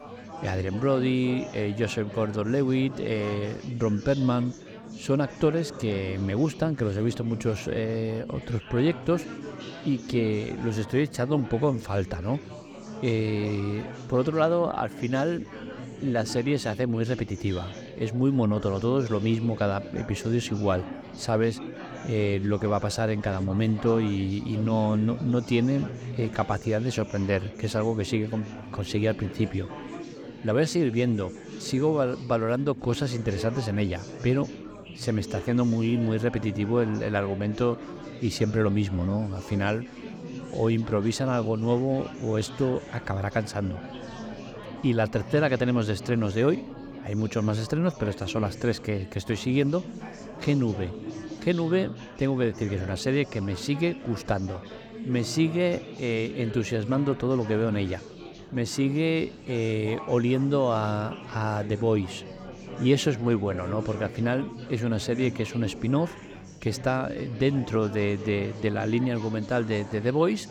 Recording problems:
chatter from many people; noticeable; throughout; 15 dB below the speech

